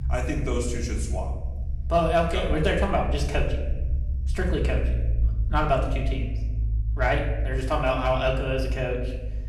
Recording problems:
off-mic speech; far
room echo; noticeable; dies away in 0.9 s
low rumble; faint; throughout; 20 dB below the speech

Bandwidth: 18 kHz